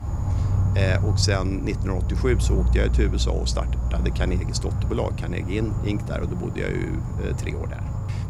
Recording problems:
animal sounds; very loud; throughout; 3 dB above the speech

